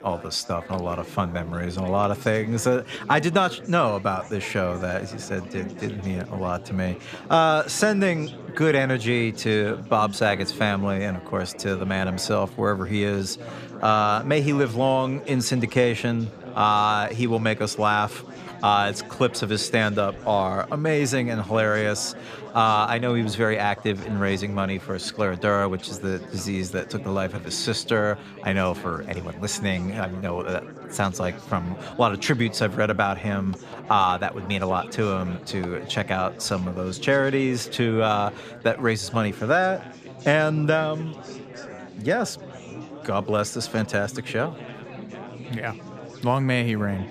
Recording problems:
chatter from many people; noticeable; throughout; 15 dB below the speech

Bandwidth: 14.5 kHz